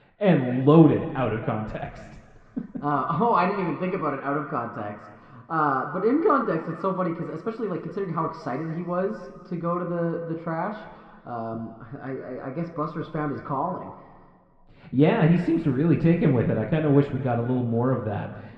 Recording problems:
muffled; very; fading above 1.5 kHz
room echo; noticeable; dies away in 1.6 s
off-mic speech; somewhat distant

